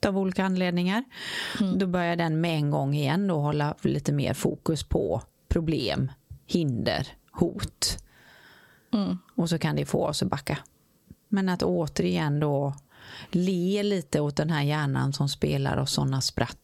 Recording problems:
squashed, flat; heavily

